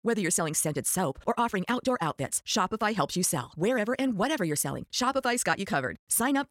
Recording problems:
wrong speed, natural pitch; too fast; 1.6 times normal speed

